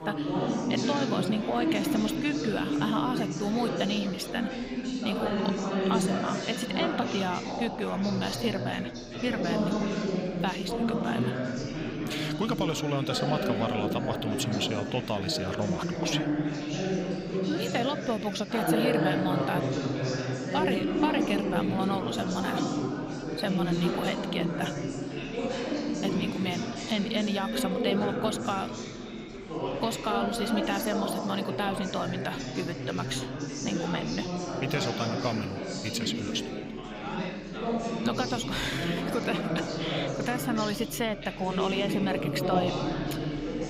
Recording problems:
chatter from many people; very loud; throughout; 1 dB above the speech

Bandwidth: 15.5 kHz